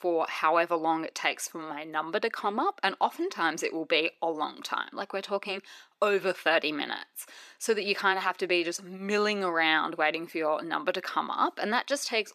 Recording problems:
thin; somewhat; fading below 350 Hz

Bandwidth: 14.5 kHz